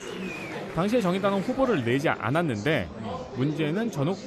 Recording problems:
murmuring crowd; noticeable; throughout; 10 dB below the speech

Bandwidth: 13.5 kHz